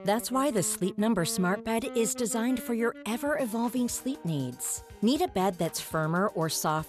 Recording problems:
background music; noticeable; throughout; 15 dB below the speech

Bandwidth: 14.5 kHz